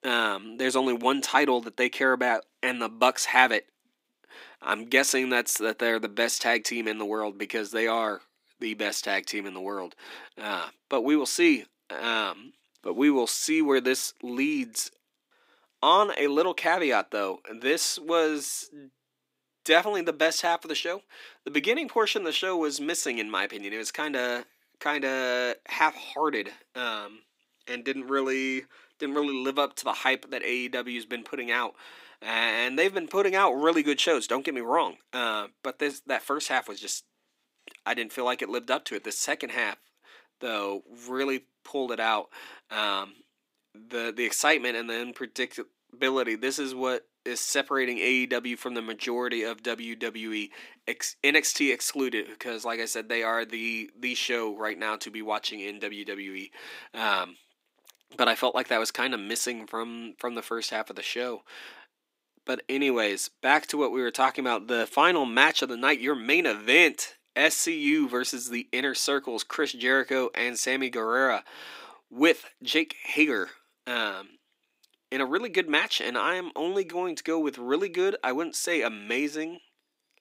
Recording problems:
thin; somewhat; fading below 250 Hz

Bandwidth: 15.5 kHz